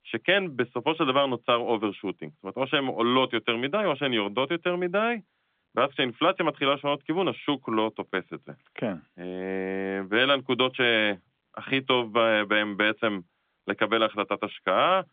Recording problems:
phone-call audio; nothing above 3.5 kHz

